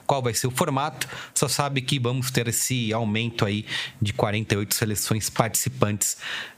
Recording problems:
squashed, flat; somewhat

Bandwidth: 15 kHz